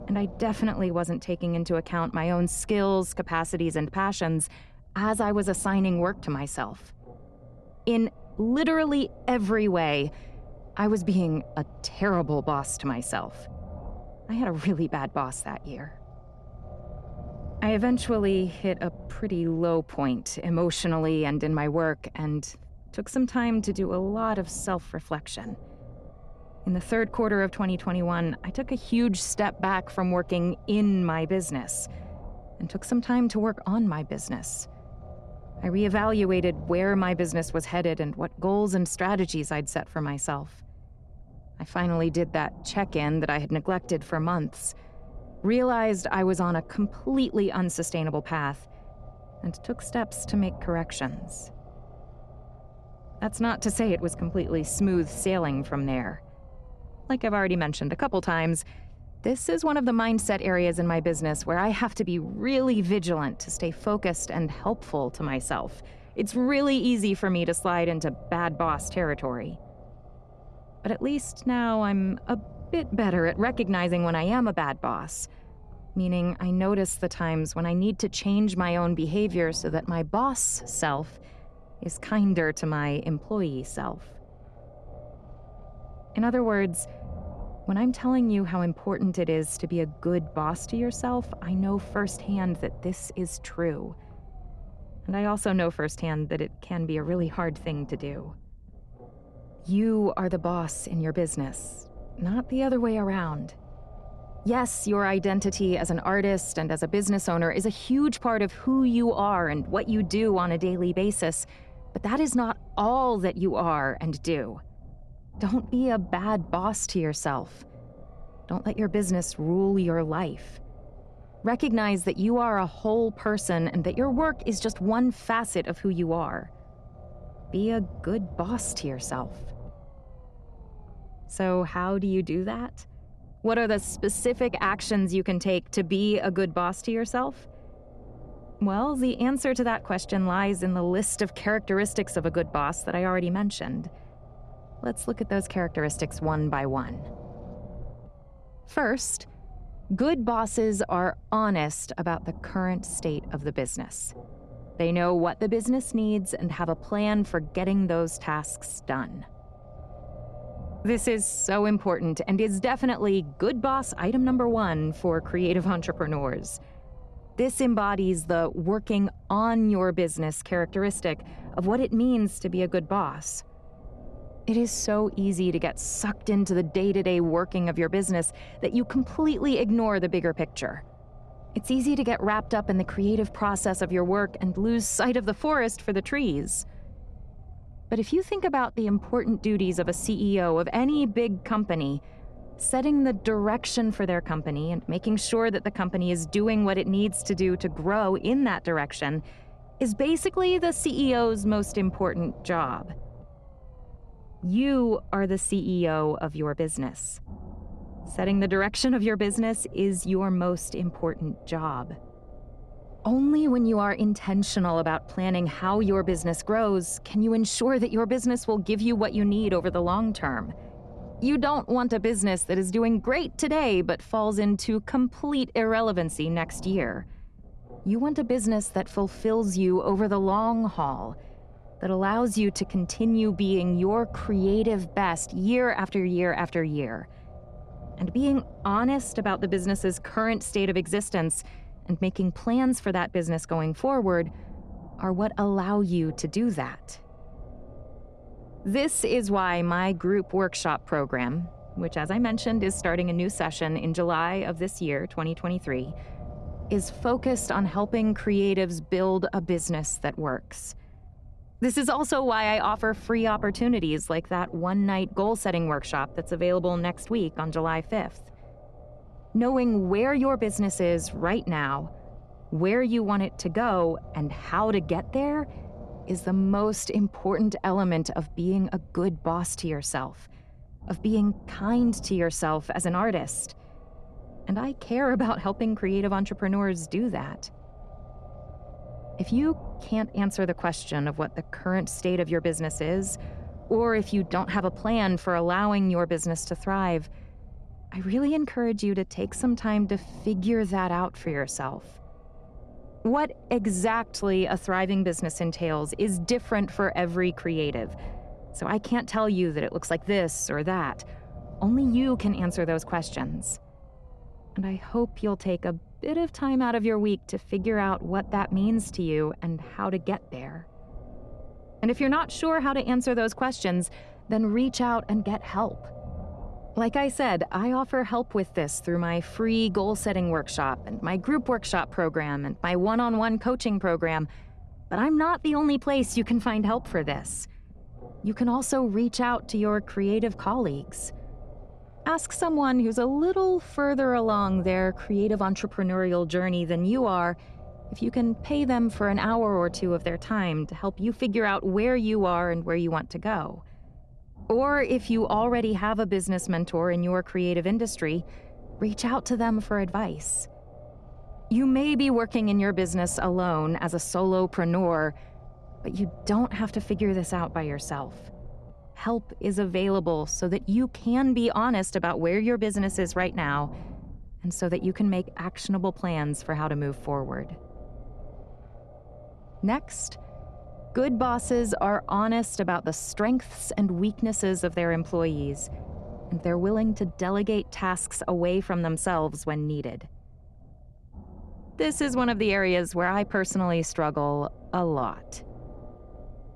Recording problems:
low rumble; faint; throughout; 20 dB below the speech

